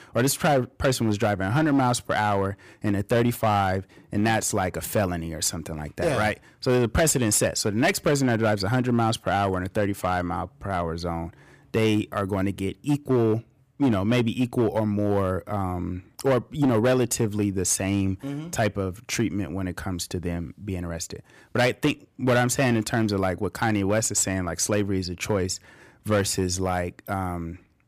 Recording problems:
distortion; slight; 6% of the sound clipped

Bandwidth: 15 kHz